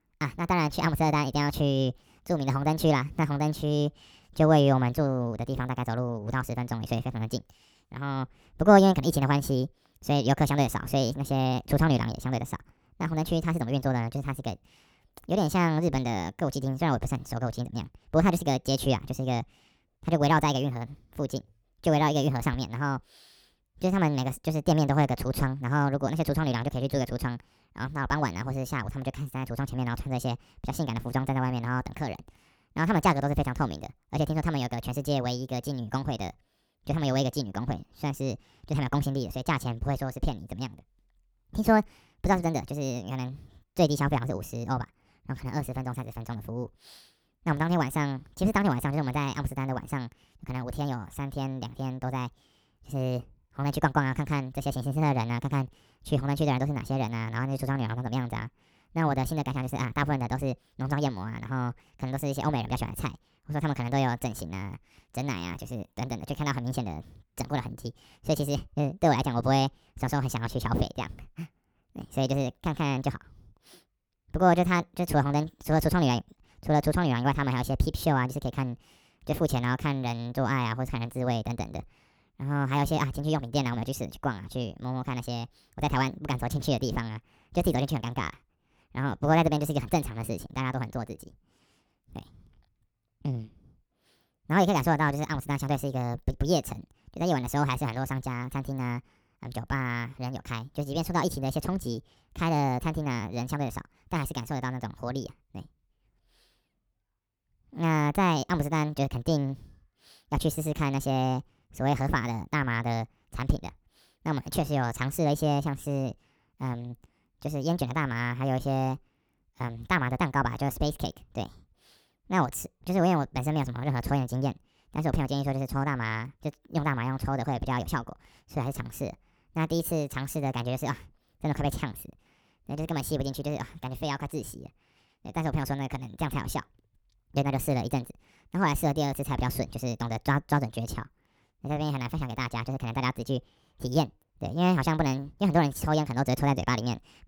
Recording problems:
wrong speed and pitch; too fast and too high; 1.5 times normal speed

